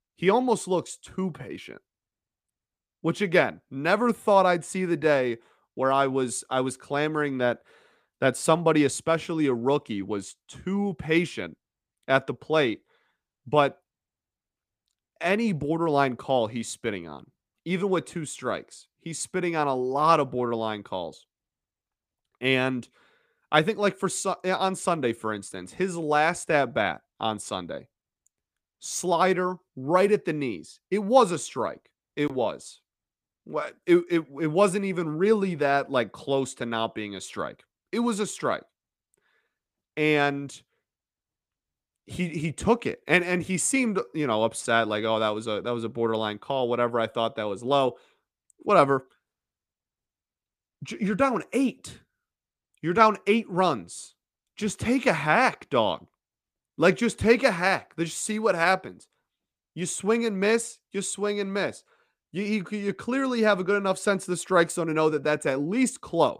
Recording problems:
none

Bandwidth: 15 kHz